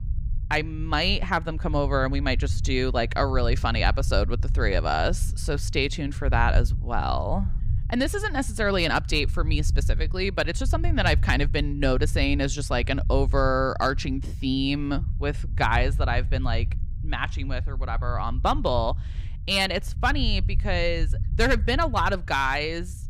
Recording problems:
low rumble; faint; throughout; 20 dB below the speech

